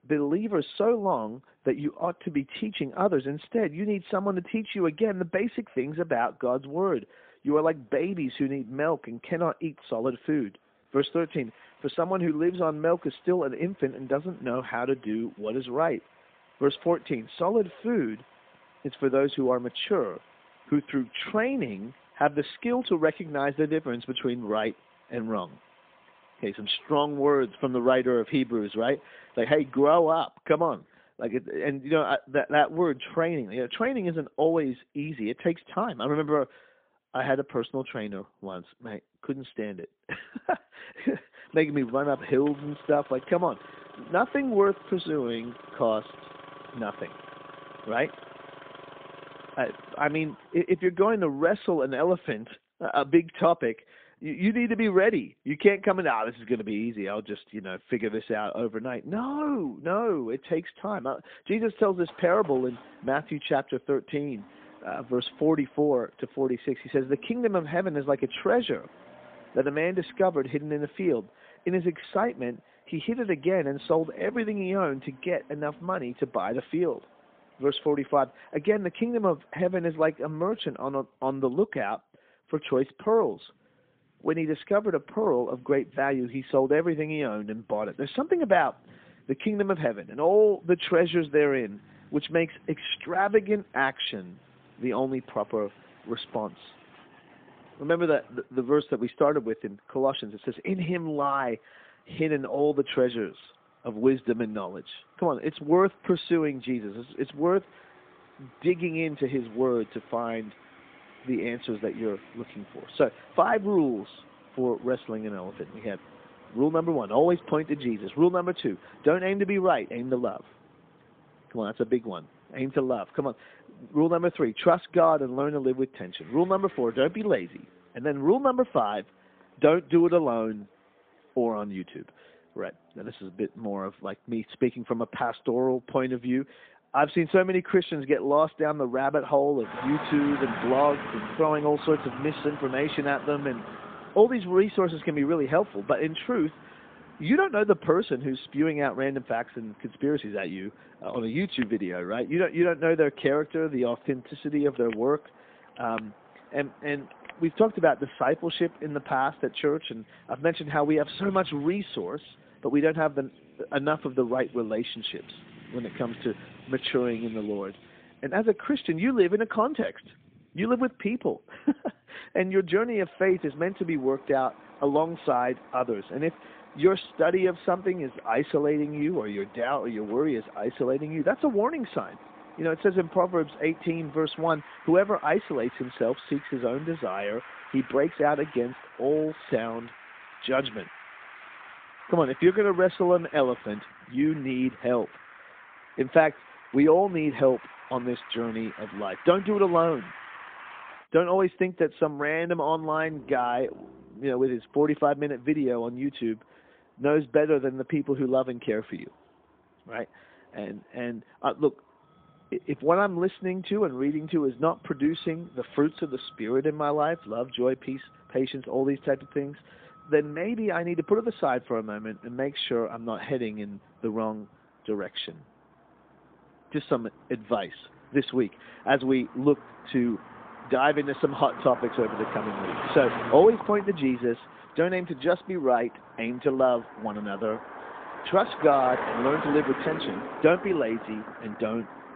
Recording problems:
phone-call audio; poor line; nothing above 3.5 kHz
traffic noise; noticeable; throughout; 15 dB below the speech

